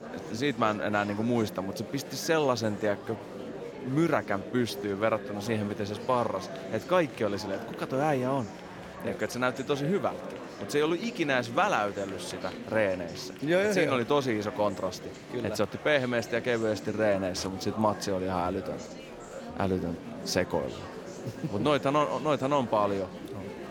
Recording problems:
murmuring crowd; noticeable; throughout; 10 dB below the speech

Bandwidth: 17.5 kHz